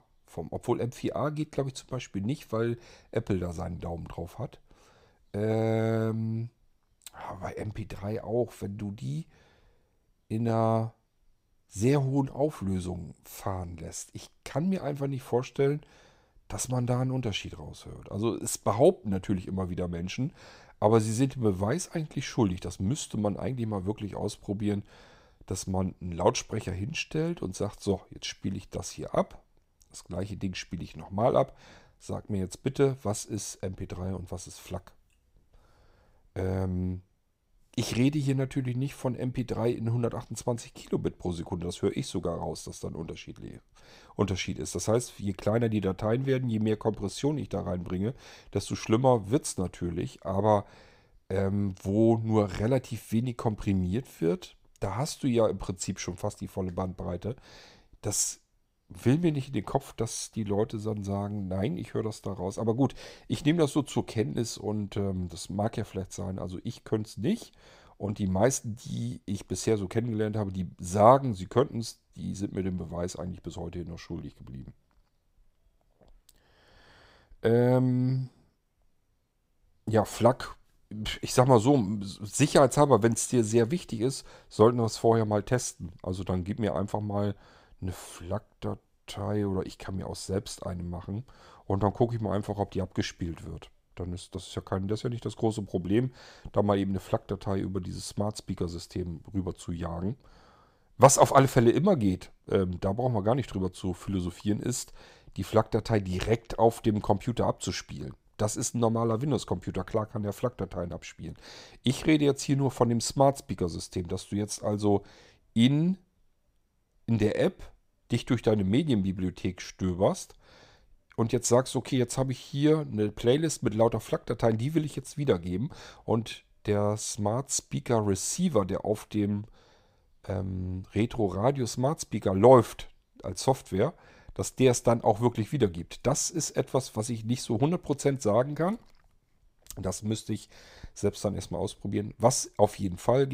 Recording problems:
abrupt cut into speech; at the end

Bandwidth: 15.5 kHz